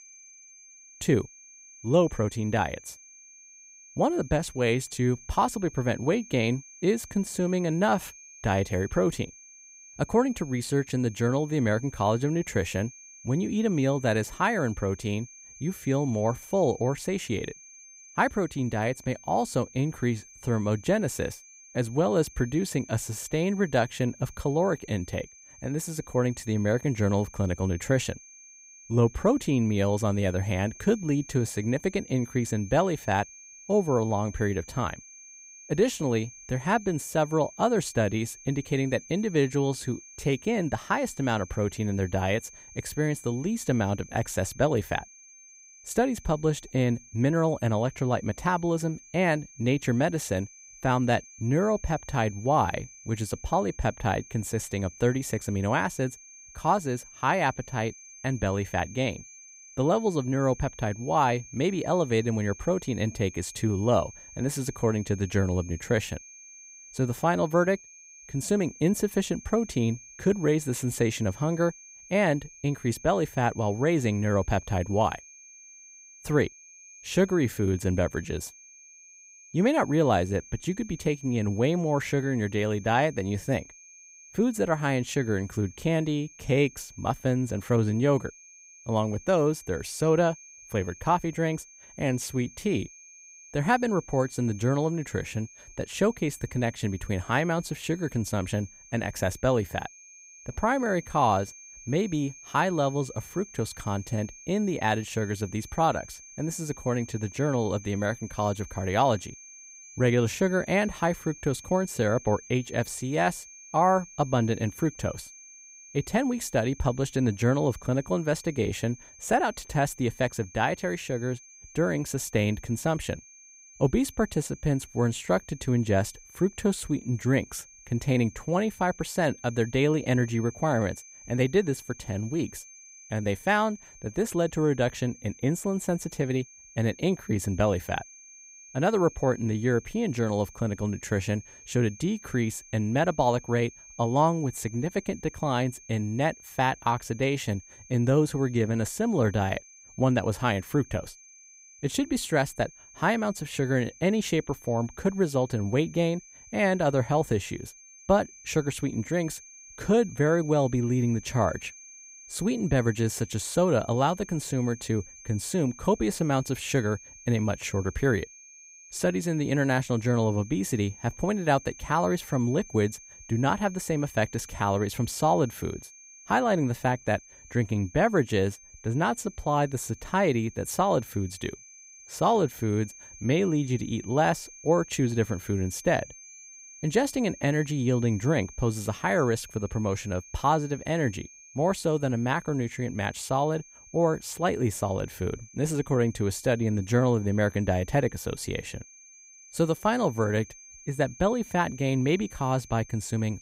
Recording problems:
high-pitched whine; noticeable; throughout; 6.5 kHz, 20 dB below the speech

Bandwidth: 15.5 kHz